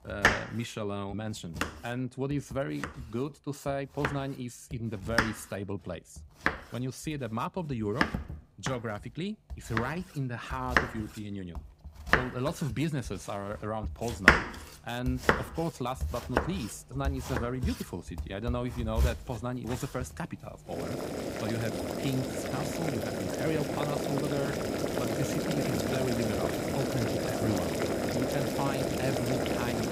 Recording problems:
household noises; very loud; throughout; 4 dB above the speech

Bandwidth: 15.5 kHz